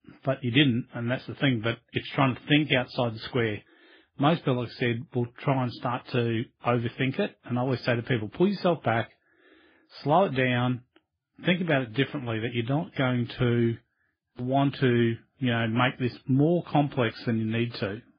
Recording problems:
garbled, watery; badly; nothing above 5 kHz

